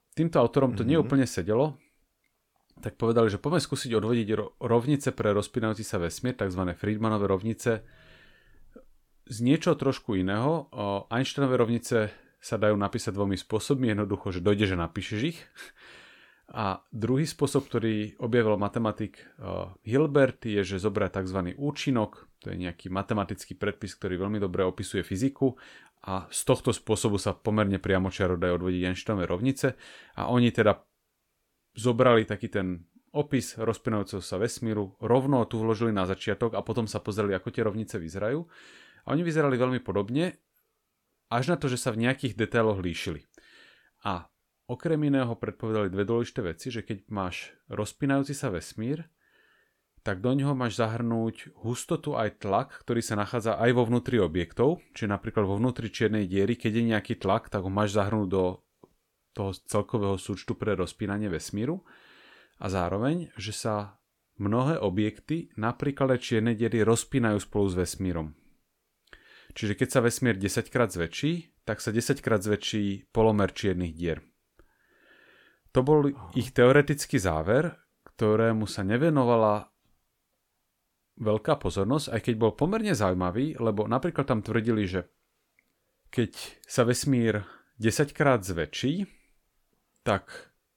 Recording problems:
none

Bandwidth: 17 kHz